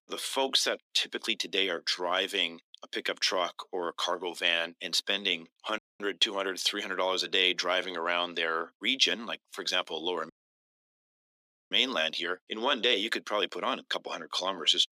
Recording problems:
thin; very; fading below 300 Hz
audio cutting out; at 6 s and at 10 s for 1.5 s

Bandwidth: 15 kHz